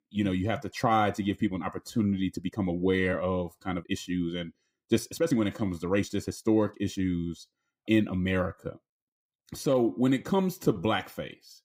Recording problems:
uneven, jittery; strongly; from 0.5 to 11 s

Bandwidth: 15.5 kHz